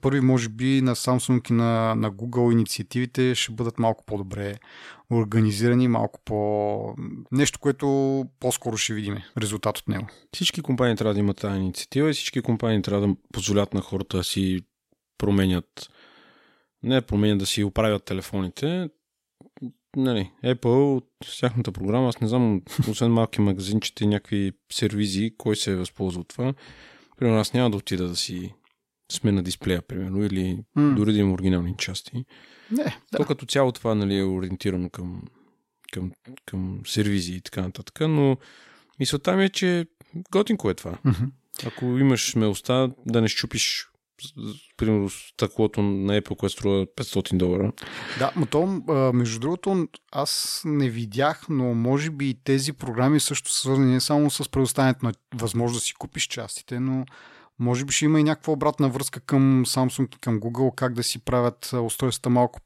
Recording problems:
none

